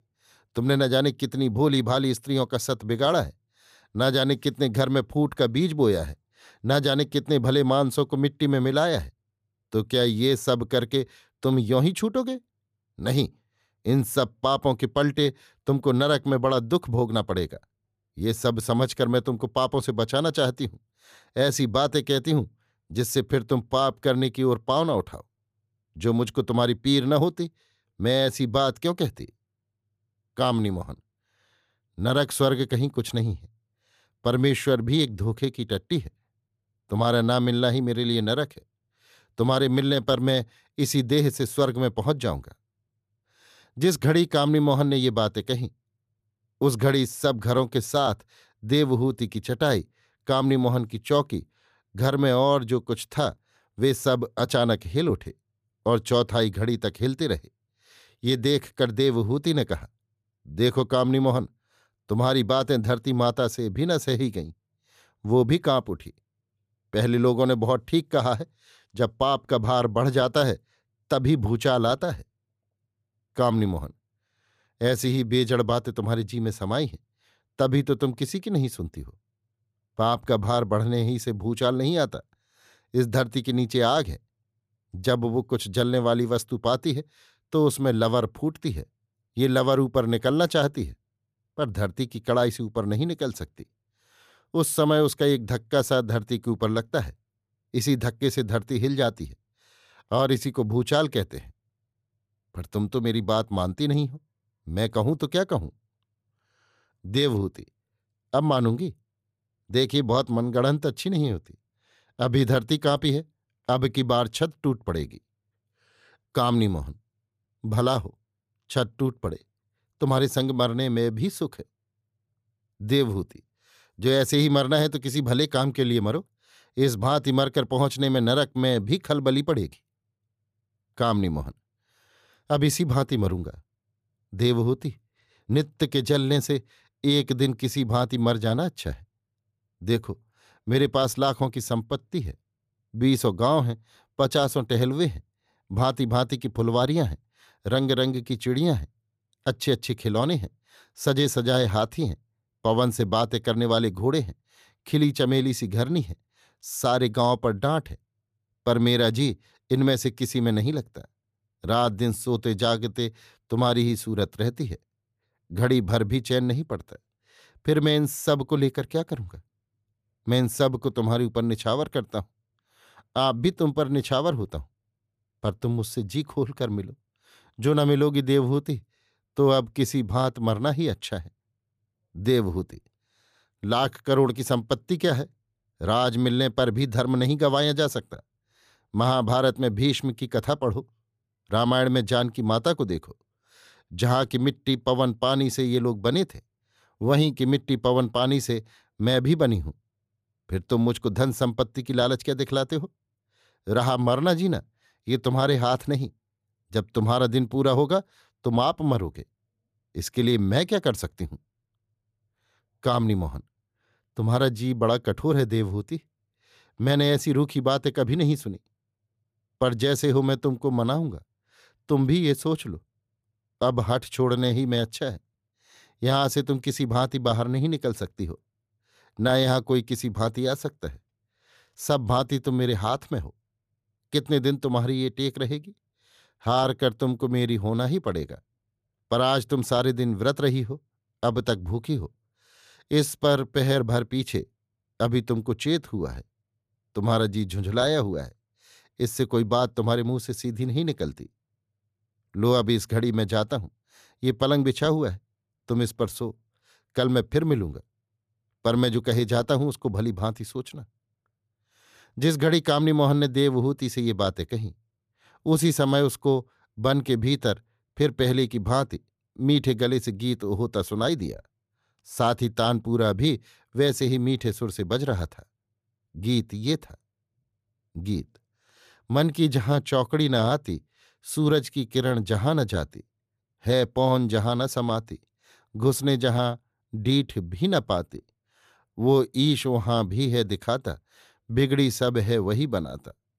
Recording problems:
none

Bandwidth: 14.5 kHz